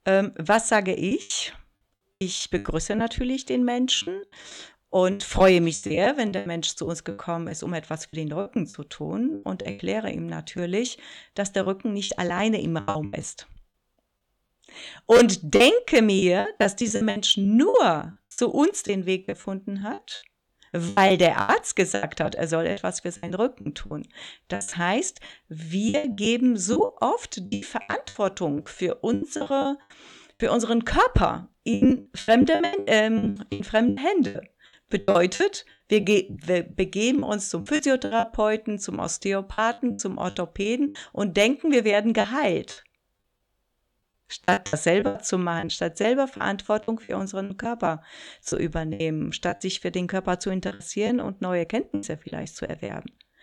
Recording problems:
choppy; very; 14% of the speech affected

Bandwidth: 18.5 kHz